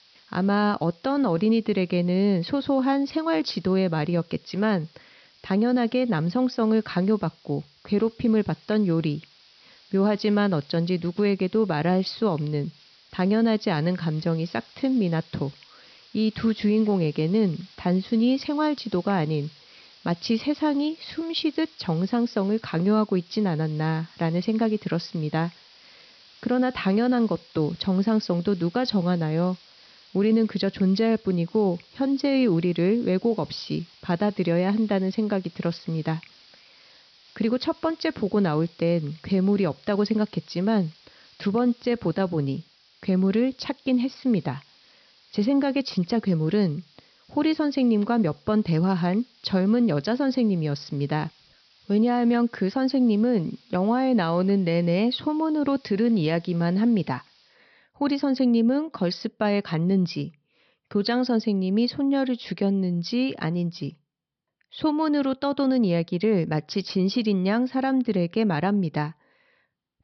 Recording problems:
high frequencies cut off; noticeable; nothing above 5.5 kHz
hiss; faint; until 58 s; 30 dB below the speech

